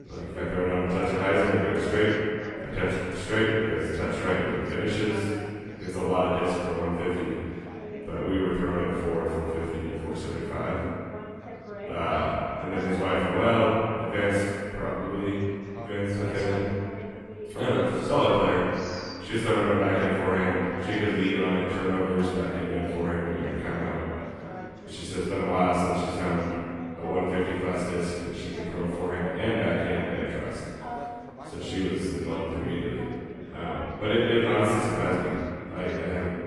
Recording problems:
room echo; strong; dies away in 2.2 s
off-mic speech; far
garbled, watery; slightly
background chatter; noticeable; throughout; 2 voices, 15 dB below the speech

